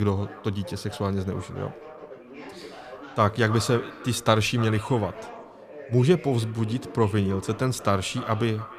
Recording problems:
echo of what is said; noticeable; throughout; 300 ms later, 15 dB below the speech
background chatter; noticeable; throughout; 2 voices, 20 dB below the speech
abrupt cut into speech; at the start

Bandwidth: 14.5 kHz